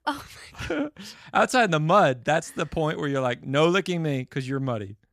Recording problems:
none

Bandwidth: 14.5 kHz